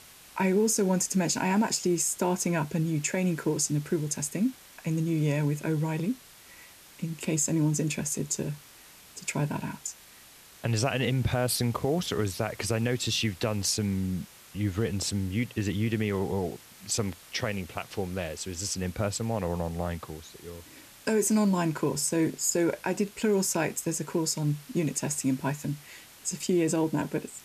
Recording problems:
hiss; faint; throughout; 20 dB below the speech

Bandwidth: 14.5 kHz